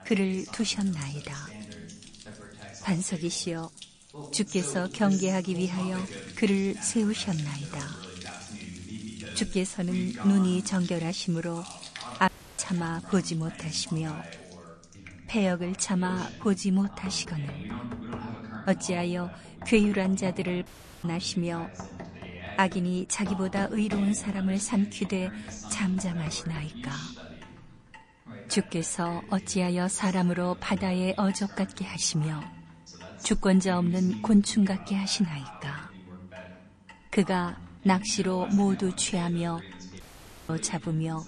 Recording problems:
garbled, watery; slightly; nothing above 9 kHz
household noises; noticeable; throughout; 20 dB below the speech
voice in the background; noticeable; throughout; 15 dB below the speech
audio cutting out; at 12 s, at 21 s and at 40 s

